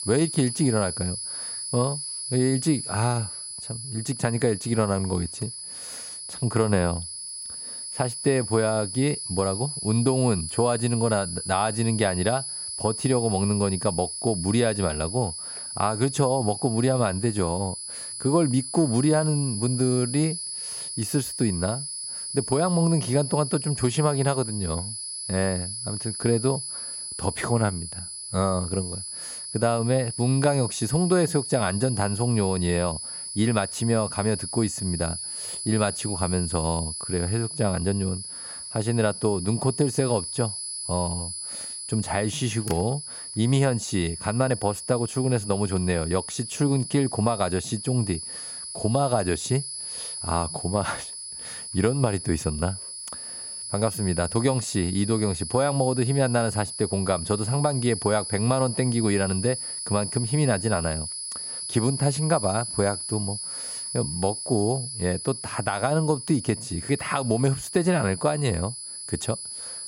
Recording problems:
high-pitched whine; loud; throughout; 10 kHz, 6 dB below the speech

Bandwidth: 16 kHz